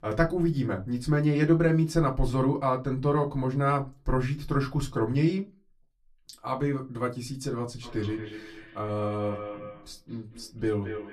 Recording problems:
off-mic speech; far
echo of what is said; noticeable; from 8 s on; 220 ms later, 15 dB below the speech
room echo; very slight; dies away in 0.2 s

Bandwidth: 14 kHz